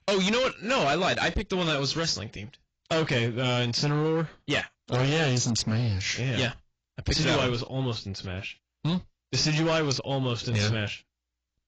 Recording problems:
distortion; heavy; 14% of the sound clipped
garbled, watery; badly; nothing above 7.5 kHz

